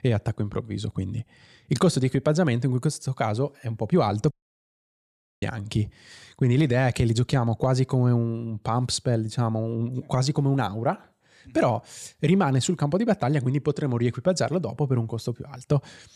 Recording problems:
audio cutting out; at 4.5 s for 1 s

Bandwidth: 14.5 kHz